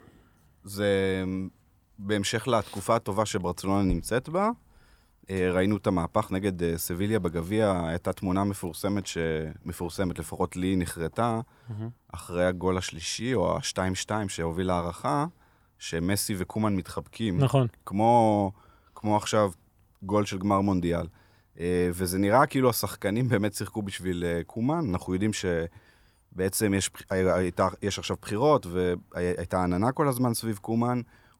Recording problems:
none

